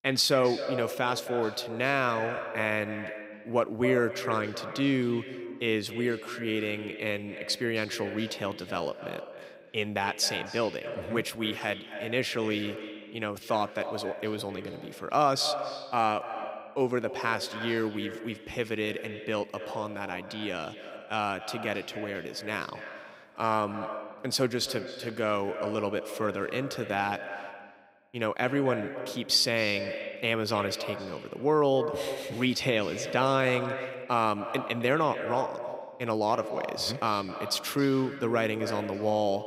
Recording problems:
echo of what is said; strong; throughout; 260 ms later, 9 dB below the speech

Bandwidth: 15.5 kHz